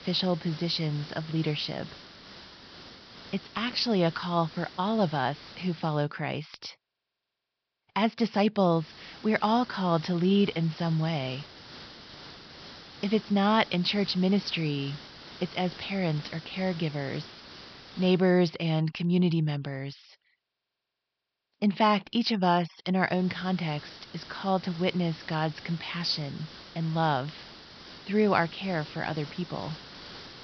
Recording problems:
high frequencies cut off; noticeable; nothing above 5.5 kHz
hiss; noticeable; until 6 s, from 8.5 to 18 s and from 23 s on; 15 dB below the speech

